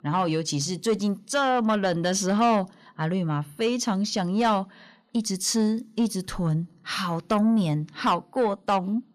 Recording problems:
distortion; slight; 10 dB below the speech

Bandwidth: 14.5 kHz